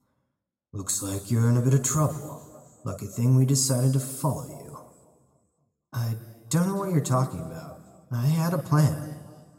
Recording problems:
room echo; slight; dies away in 1.5 s
off-mic speech; somewhat distant

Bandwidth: 16 kHz